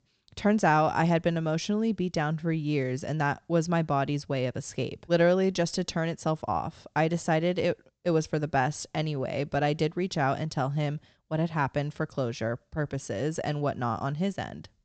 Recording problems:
high frequencies cut off; noticeable; nothing above 8 kHz

